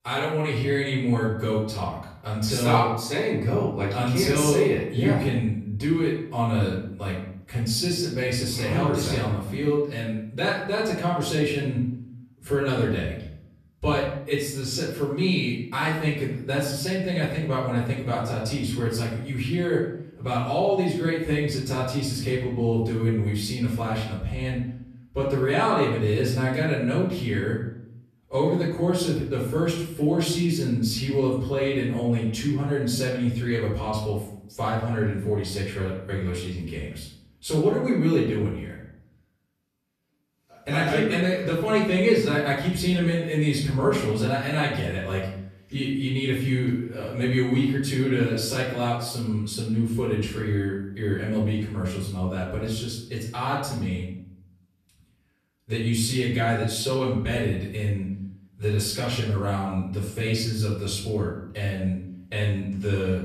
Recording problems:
off-mic speech; far
room echo; noticeable; dies away in 0.7 s

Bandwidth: 14.5 kHz